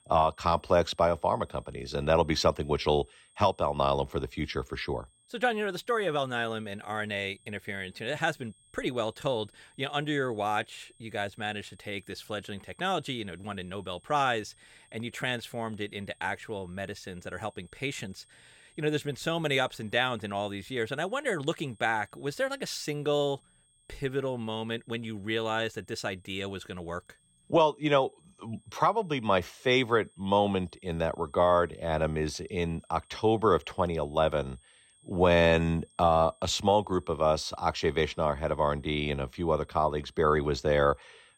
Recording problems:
high-pitched whine; faint; throughout; 8.5 kHz, 30 dB below the speech

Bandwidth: 16.5 kHz